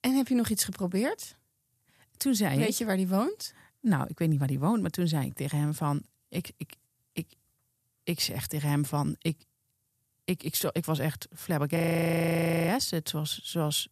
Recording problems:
audio freezing; at 12 s for 1 s

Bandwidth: 14.5 kHz